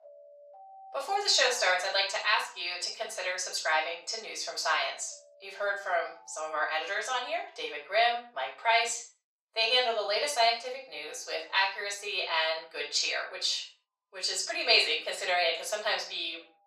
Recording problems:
off-mic speech; far
thin; very; fading below 500 Hz
room echo; noticeable; dies away in 0.3 s
alarms or sirens; faint; throughout; 25 dB below the speech

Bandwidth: 15.5 kHz